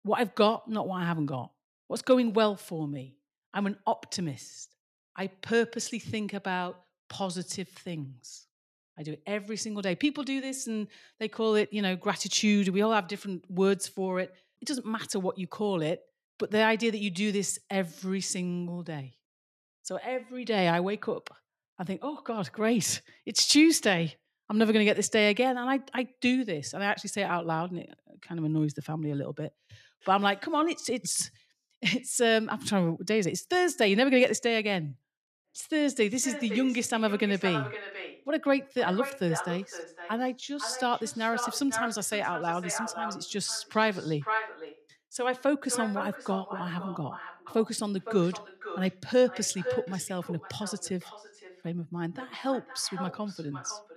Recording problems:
echo of what is said; strong; from 35 s on; 510 ms later, 10 dB below the speech

